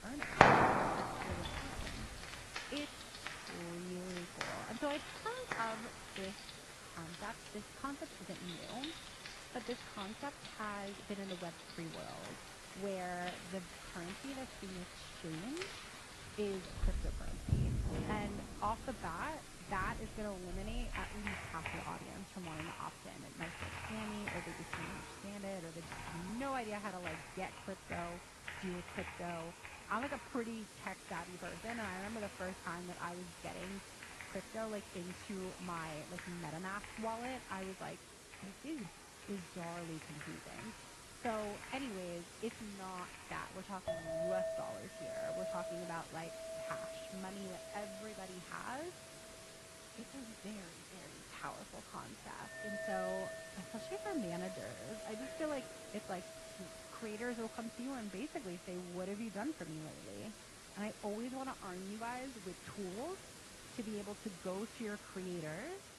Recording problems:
muffled; slightly; fading above 2.5 kHz
garbled, watery; slightly
household noises; very loud; throughout; 3 dB above the speech
hiss; loud; throughout; 7 dB below the speech
background chatter; faint; throughout; 3 voices, 20 dB below the speech

